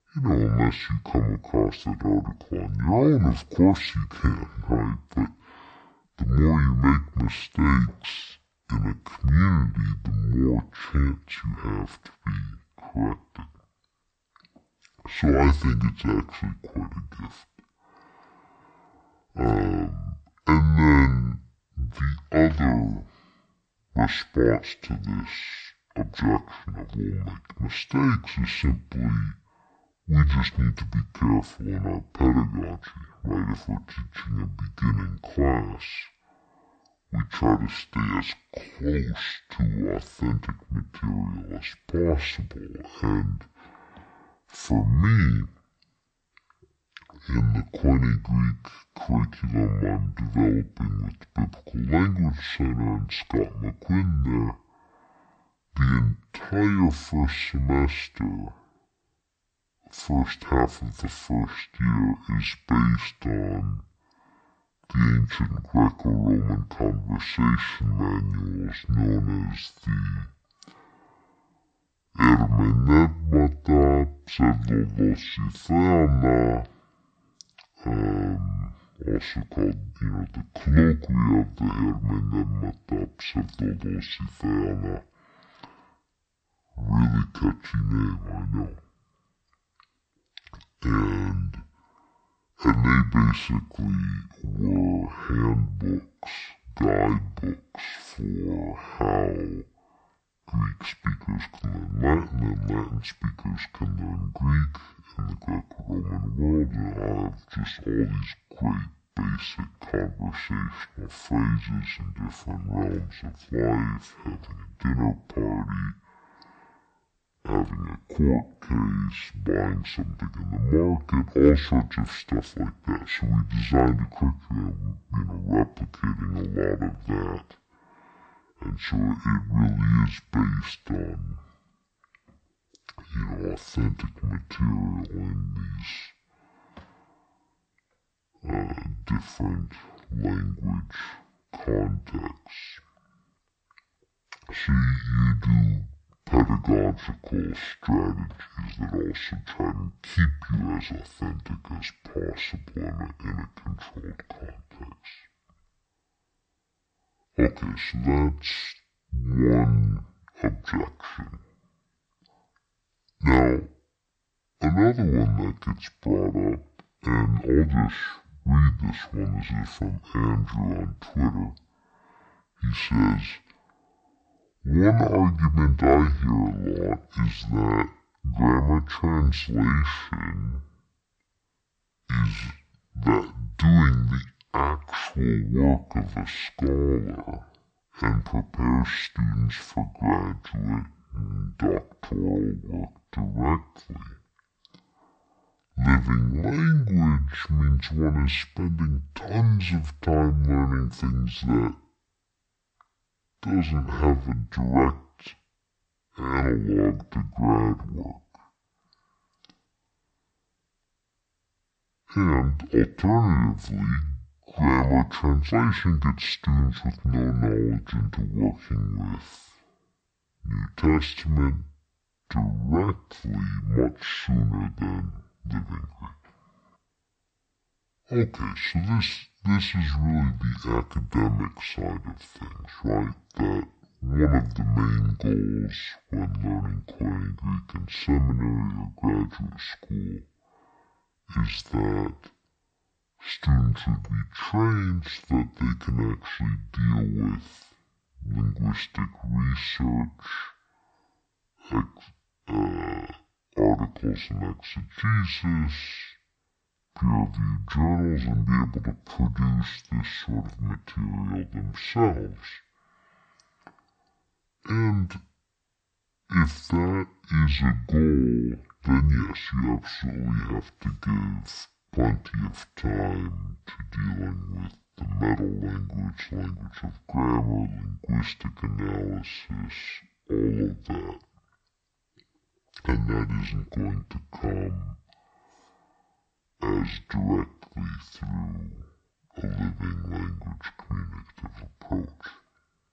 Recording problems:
wrong speed and pitch; too slow and too low; 0.5 times normal speed

